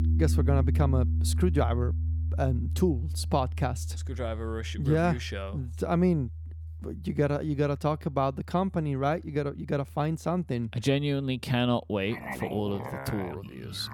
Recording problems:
background music; loud; throughout; 3 dB below the speech

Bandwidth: 17.5 kHz